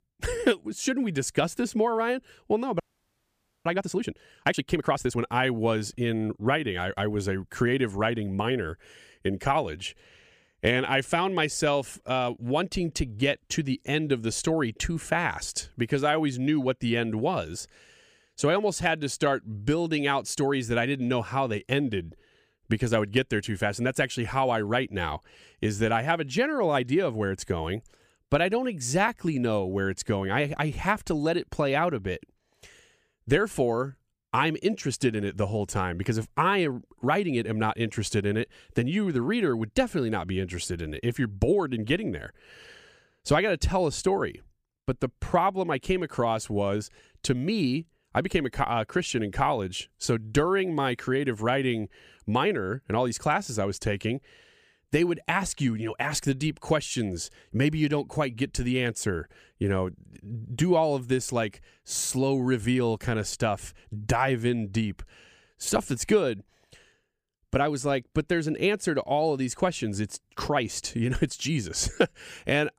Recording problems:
audio freezing; at 3 s for 1 s

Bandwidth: 15 kHz